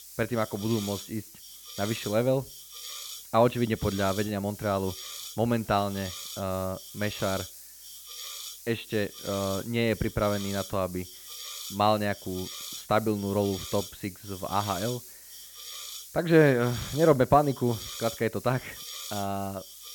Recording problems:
high frequencies cut off; severe; nothing above 4 kHz
hiss; noticeable; throughout; 10 dB below the speech

